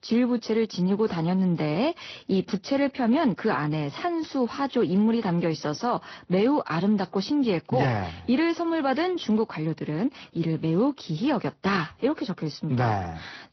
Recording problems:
high frequencies cut off; noticeable; nothing above 6 kHz
garbled, watery; slightly

